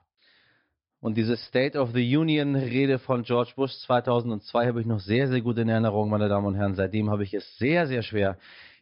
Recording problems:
high frequencies cut off; noticeable; nothing above 5.5 kHz

